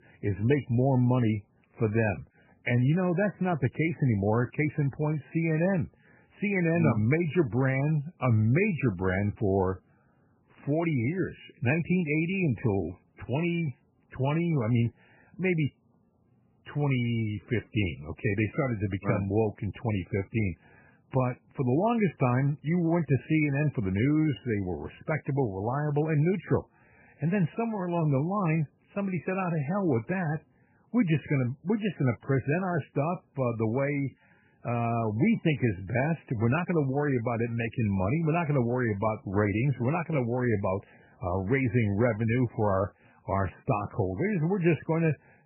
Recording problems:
garbled, watery; badly; nothing above 2.5 kHz

